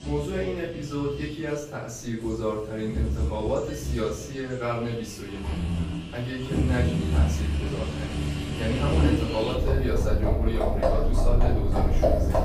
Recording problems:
off-mic speech; far
room echo; noticeable; dies away in 0.4 s
animal sounds; very loud; throughout; 3 dB above the speech

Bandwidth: 15 kHz